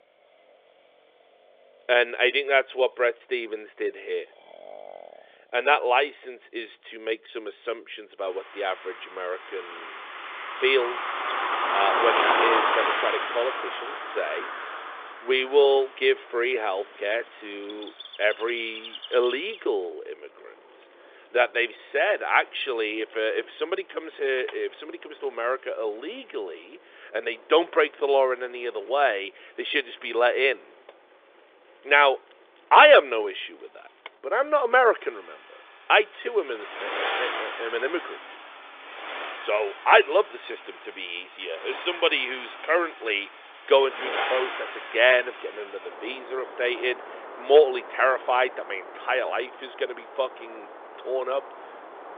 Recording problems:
phone-call audio; nothing above 3.5 kHz
traffic noise; loud; throughout; 7 dB below the speech

